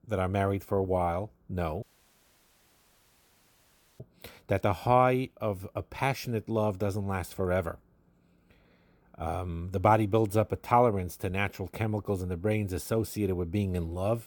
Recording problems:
audio cutting out; at 2 s for 2 s

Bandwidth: 18.5 kHz